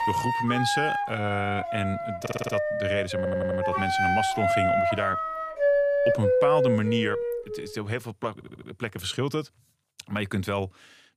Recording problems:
background music; very loud; until 7.5 s; 4 dB above the speech
audio stuttering; at 2 s, at 3 s and at 8.5 s

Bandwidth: 15 kHz